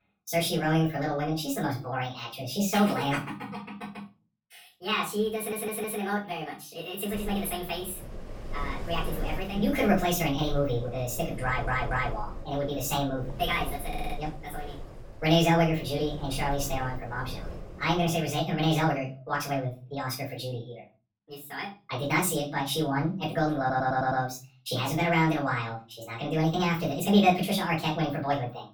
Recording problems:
off-mic speech; far
wrong speed and pitch; too fast and too high; 1.5 times normal speed
room echo; slight; dies away in 0.3 s
wind noise on the microphone; occasional gusts; from 7 to 18 s; 15 dB below the speech
audio stuttering; 4 times, first at 5.5 s

